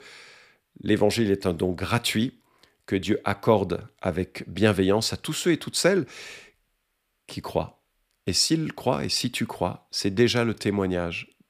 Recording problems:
none

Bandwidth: 15 kHz